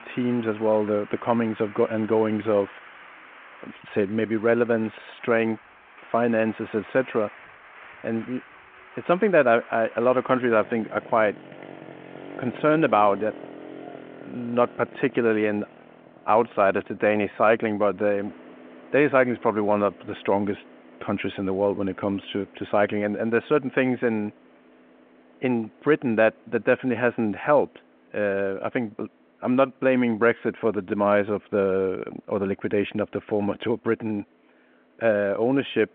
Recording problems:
phone-call audio
traffic noise; faint; throughout; 20 dB below the speech

